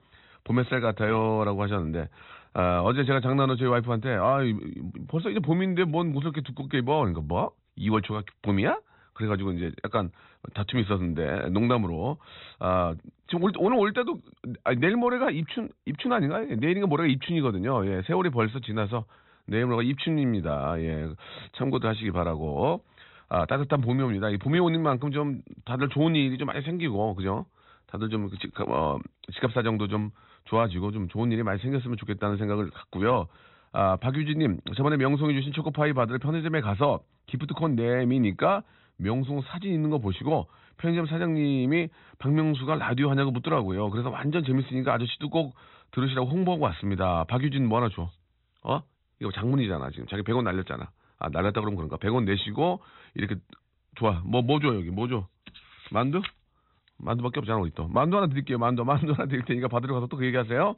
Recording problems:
high frequencies cut off; severe; nothing above 4 kHz

